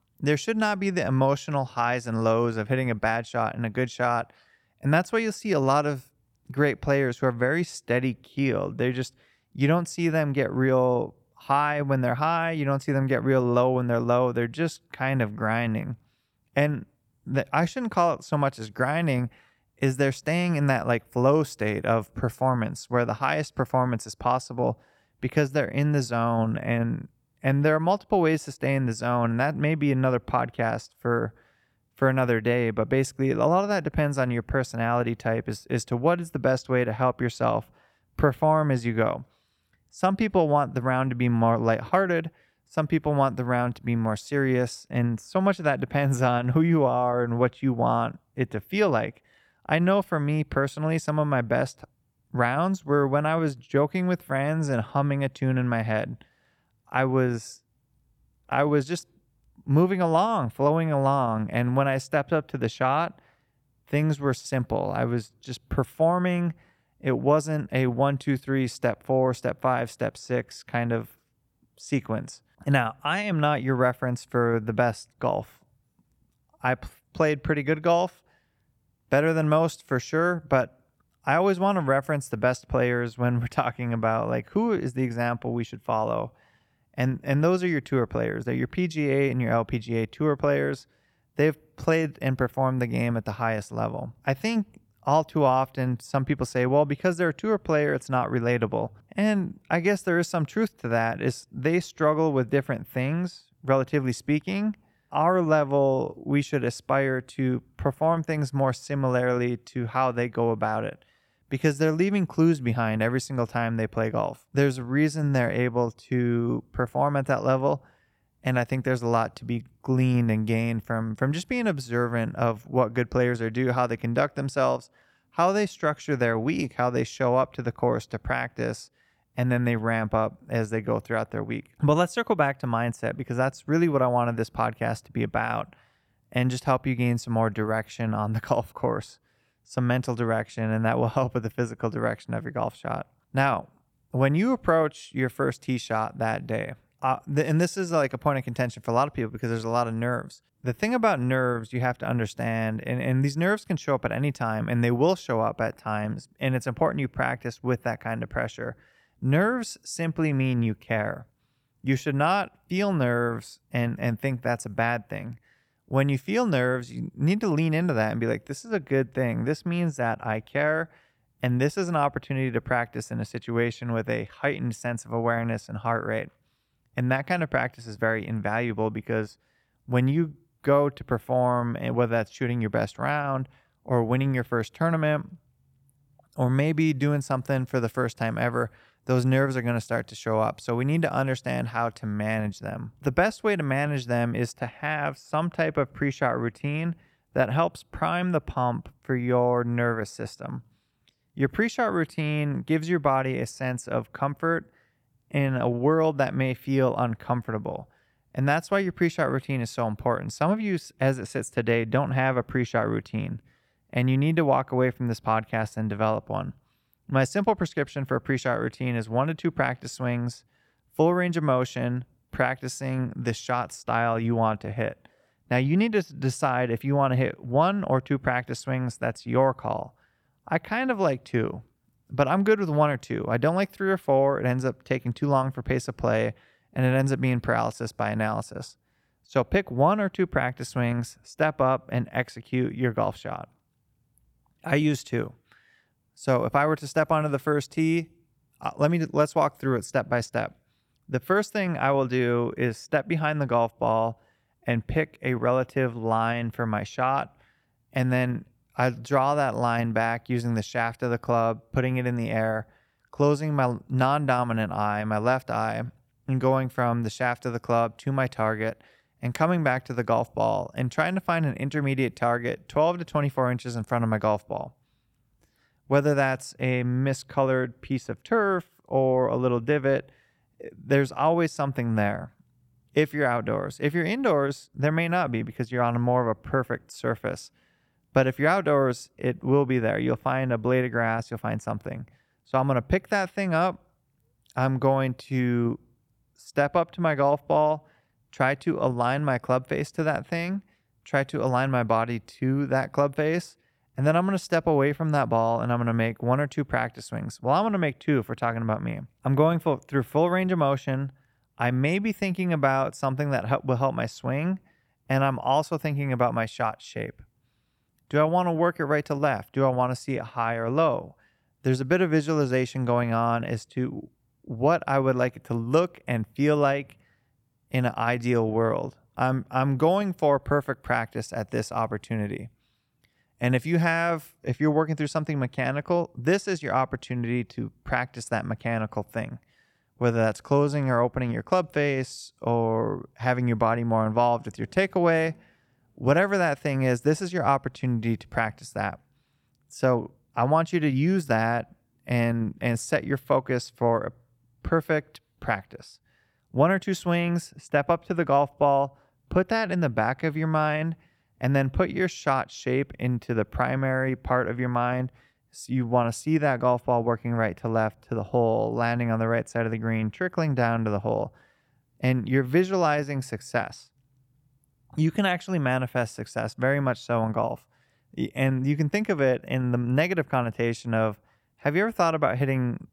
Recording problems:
none

